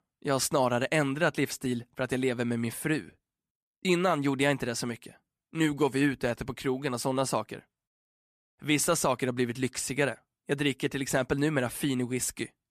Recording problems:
none

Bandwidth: 14.5 kHz